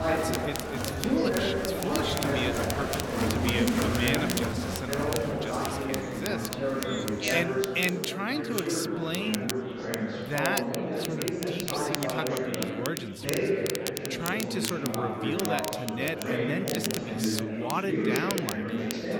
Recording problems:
chatter from many people; very loud; throughout; 3 dB above the speech
crackle, like an old record; loud; 5 dB below the speech

